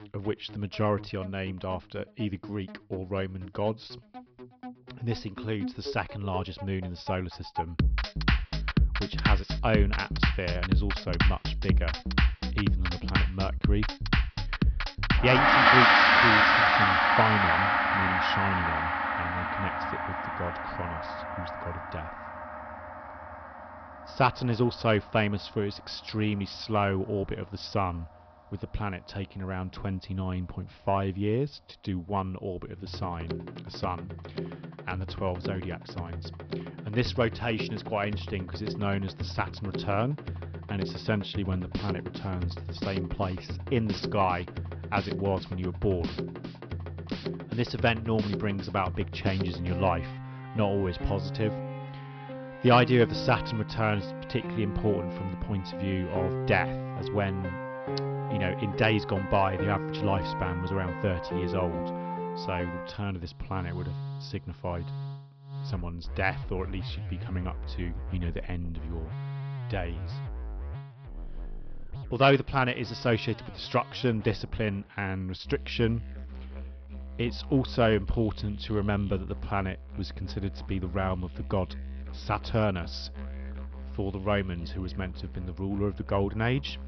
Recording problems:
high frequencies cut off; noticeable; nothing above 5.5 kHz
background music; very loud; throughout; as loud as the speech

